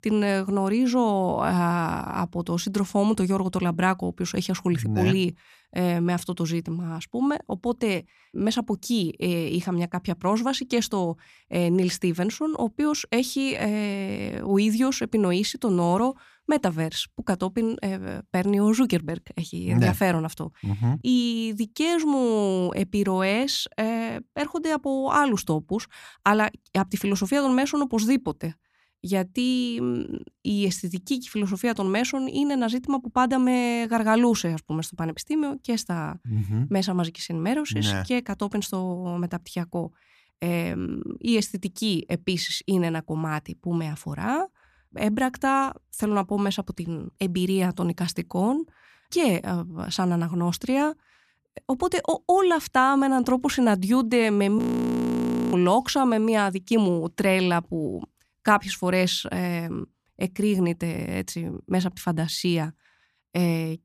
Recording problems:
audio freezing; at 55 s for 1 s

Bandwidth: 14.5 kHz